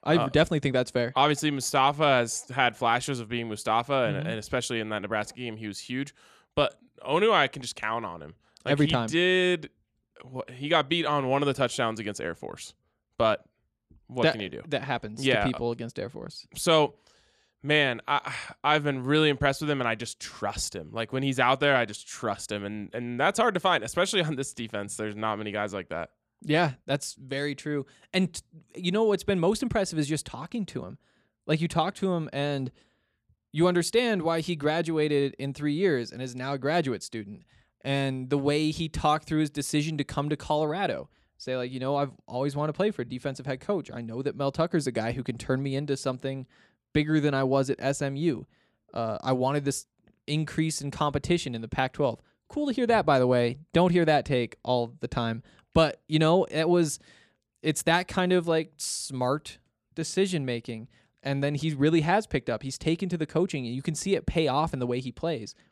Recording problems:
none

